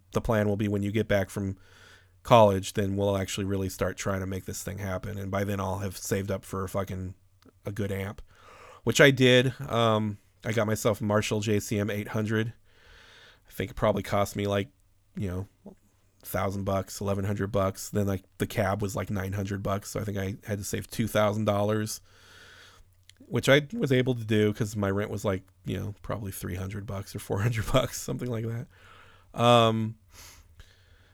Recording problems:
none

